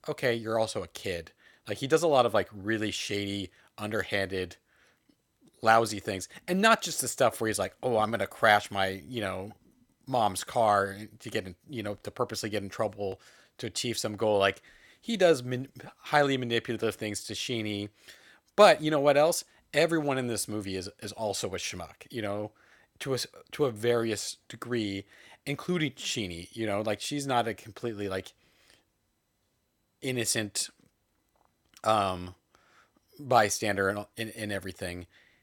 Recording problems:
none

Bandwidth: 18 kHz